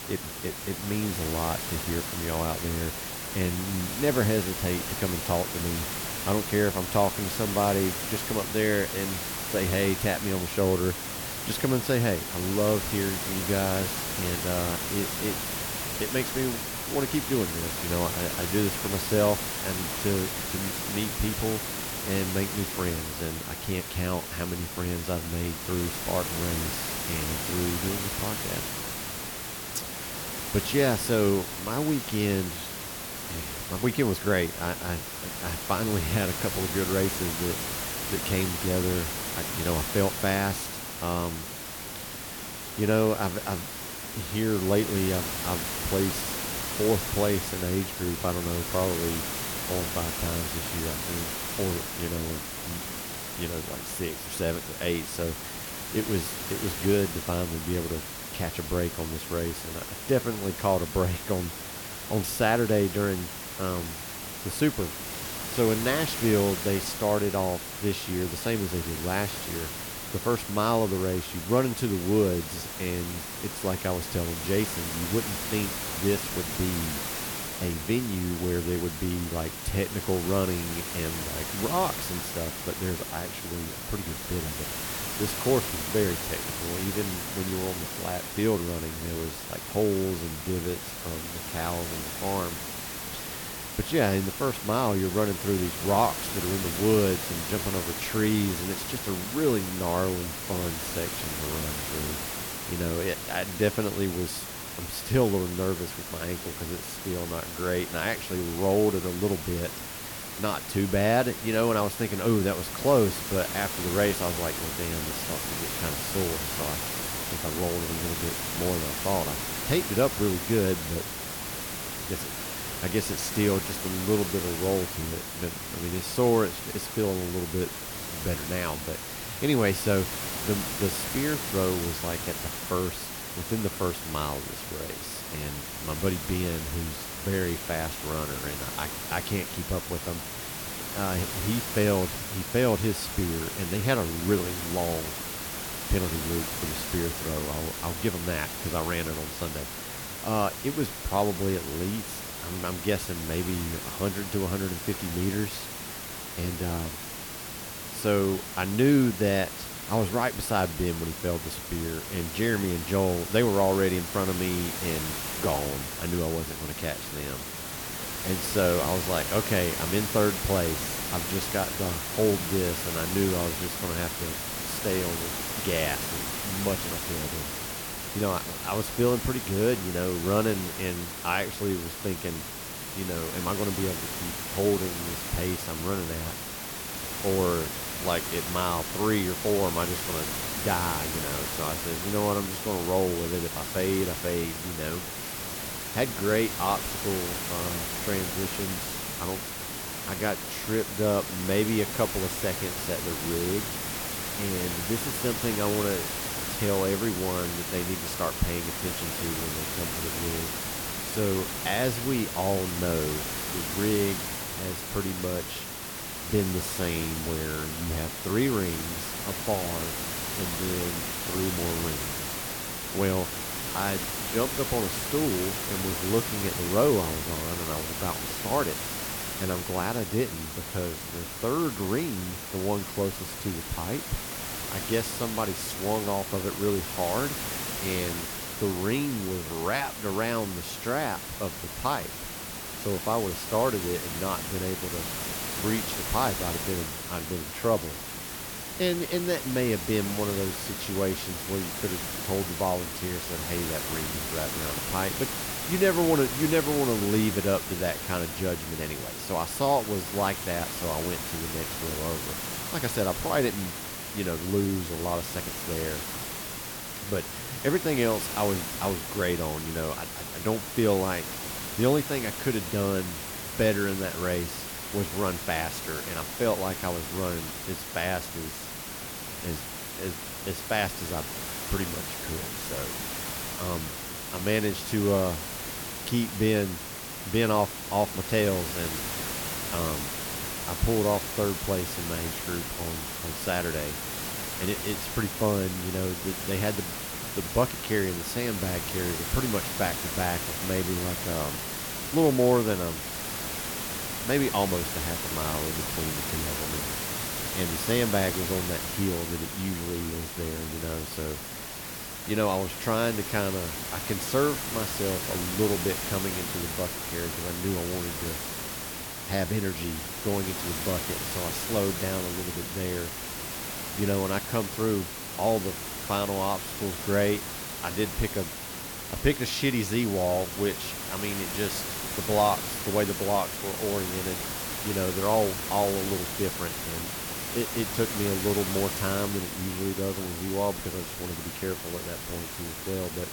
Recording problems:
hiss; loud; throughout; 3 dB below the speech

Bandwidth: 18 kHz